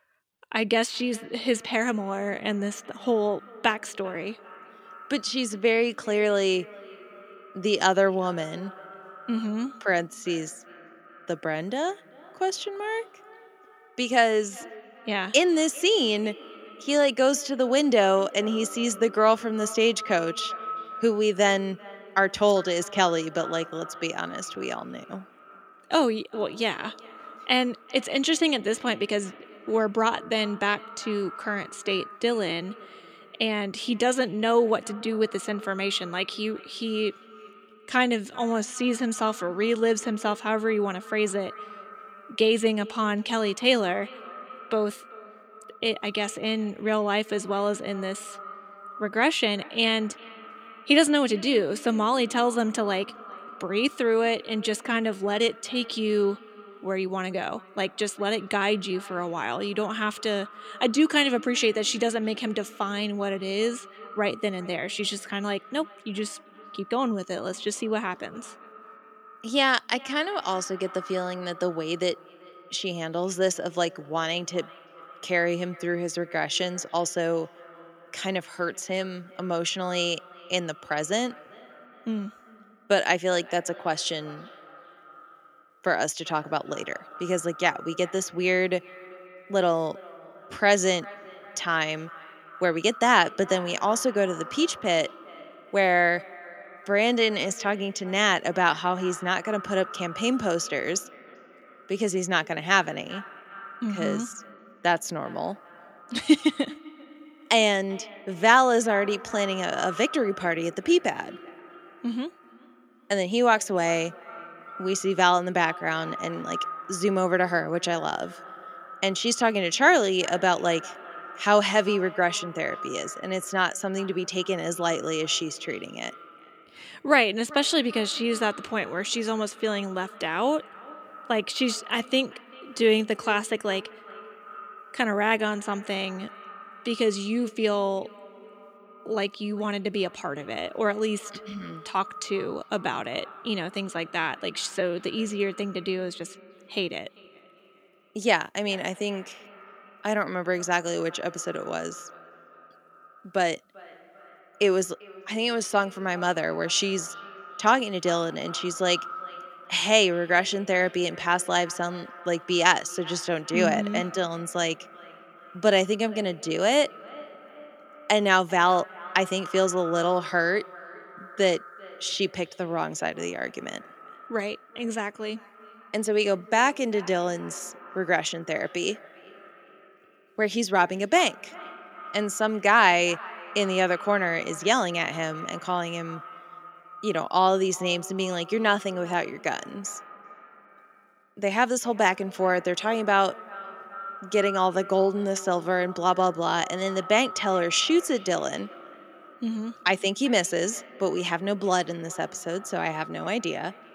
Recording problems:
echo of what is said; noticeable; throughout; 390 ms later, 20 dB below the speech

